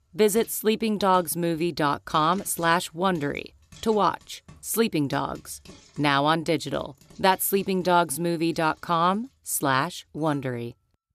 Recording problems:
household noises; faint; throughout; 30 dB below the speech

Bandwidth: 14.5 kHz